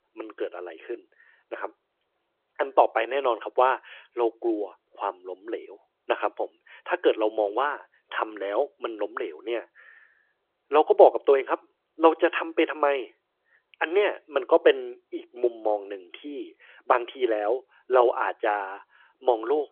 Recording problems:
phone-call audio

